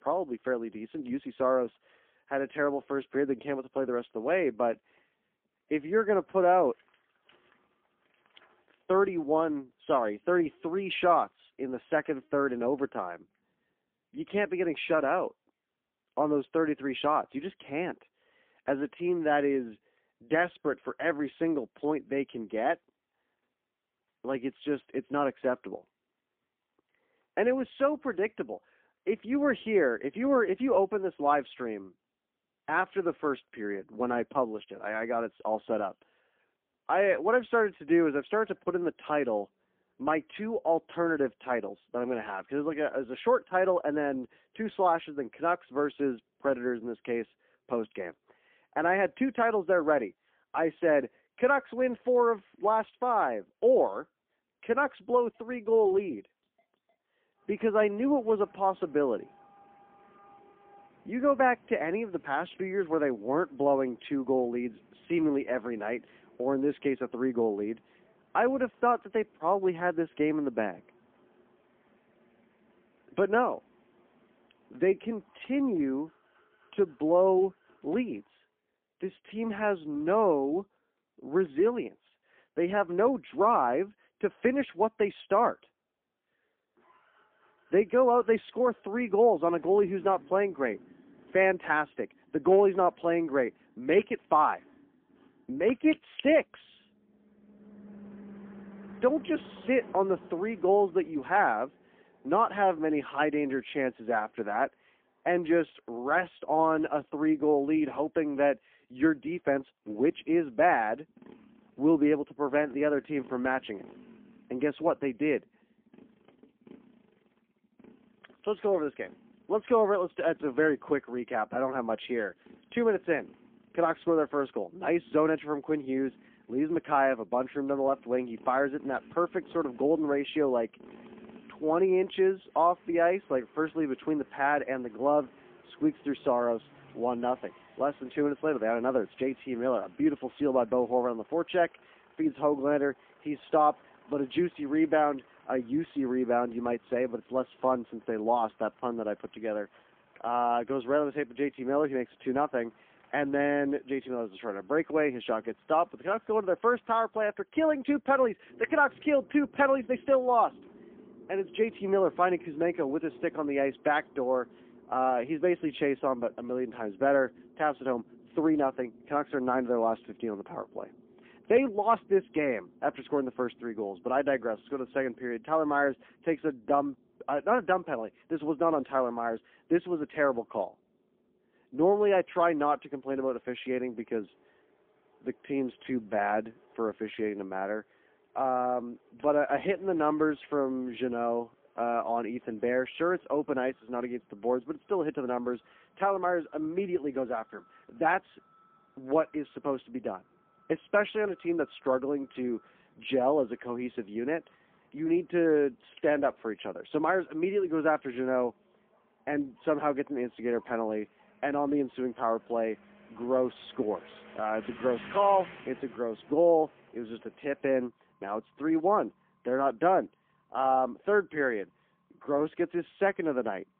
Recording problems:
phone-call audio; poor line; nothing above 3.5 kHz
traffic noise; faint; throughout; 25 dB below the speech

